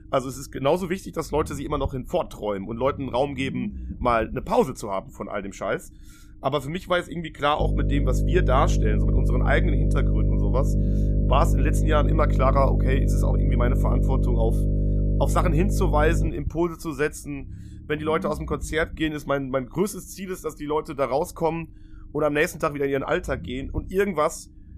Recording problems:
electrical hum; loud; from 7.5 to 16 s; 50 Hz, 8 dB below the speech
low rumble; faint; throughout; 25 dB below the speech

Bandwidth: 14.5 kHz